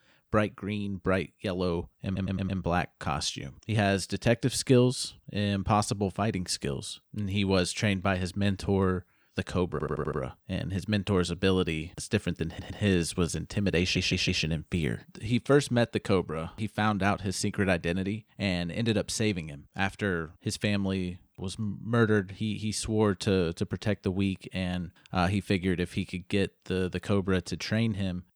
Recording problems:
audio stuttering; 4 times, first at 2 s

